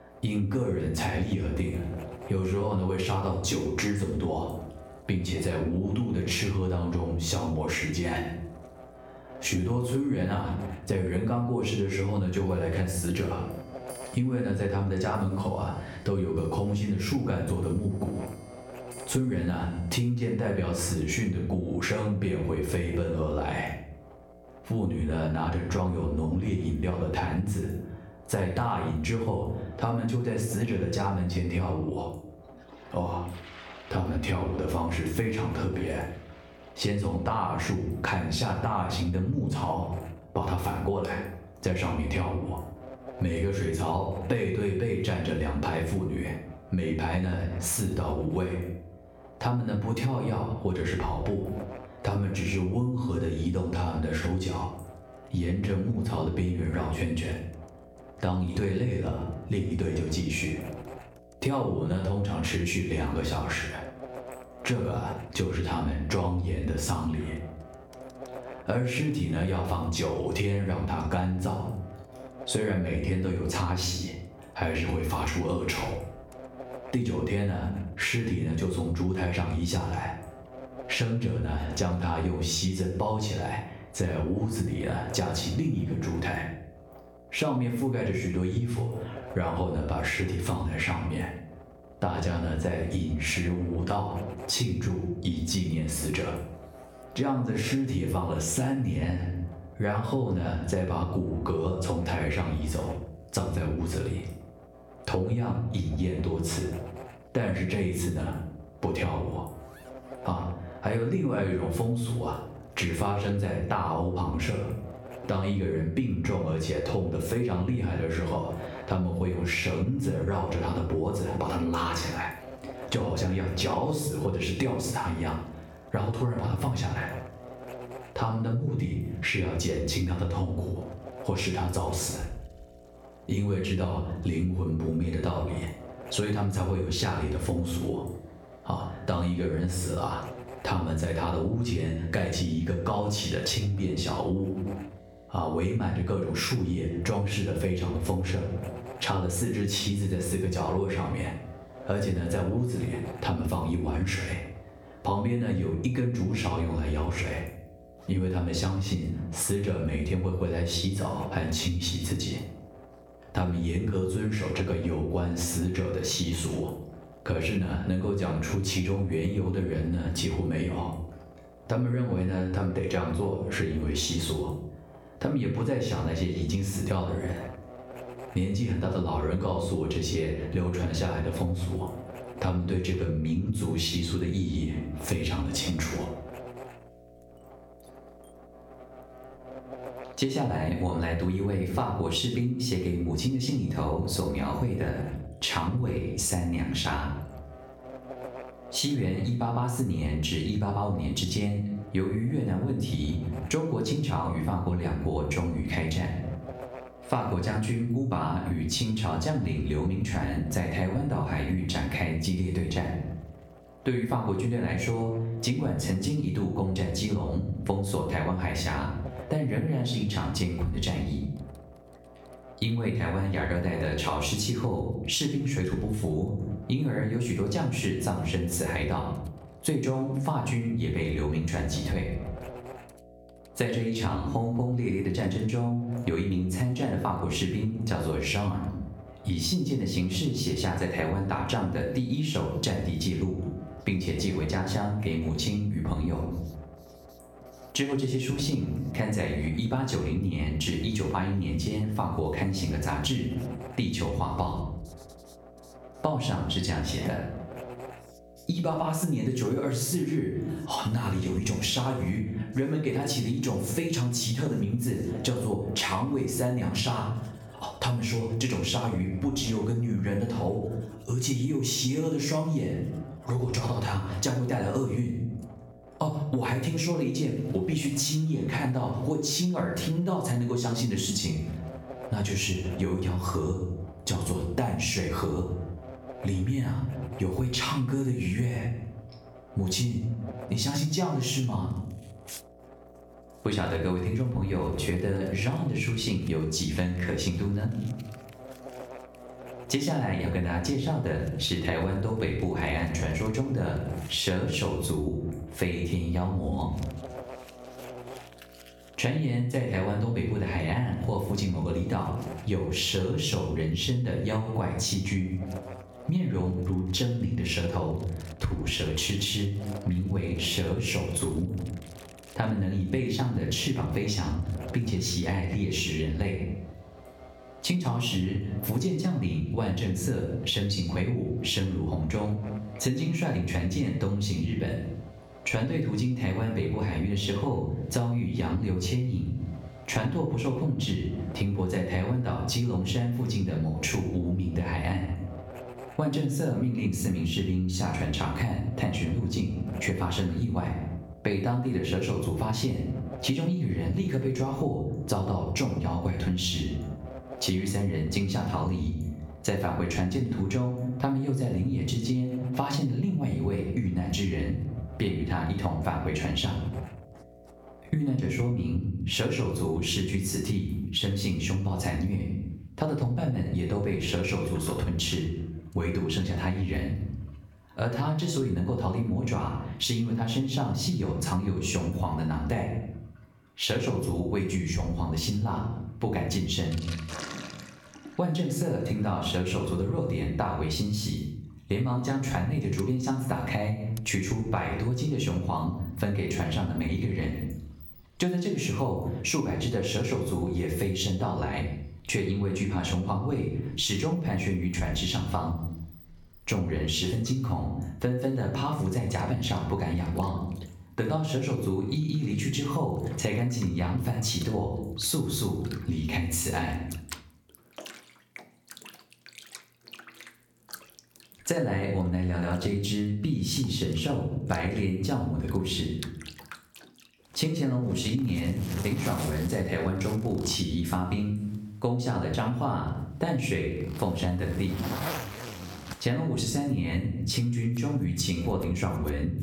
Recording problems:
off-mic speech; far
room echo; slight; dies away in 0.5 s
squashed, flat; somewhat, background pumping
electrical hum; noticeable; until 6:09; 60 Hz, 15 dB below the speech
household noises; faint; throughout; 20 dB below the speech

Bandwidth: 17.5 kHz